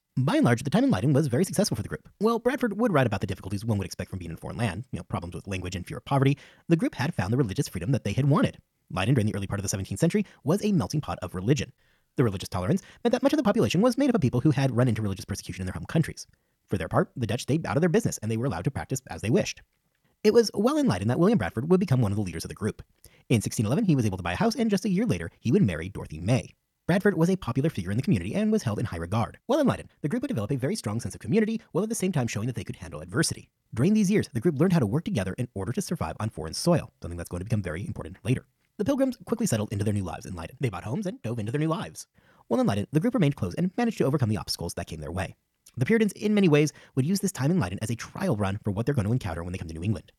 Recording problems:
wrong speed, natural pitch; too fast; 1.5 times normal speed

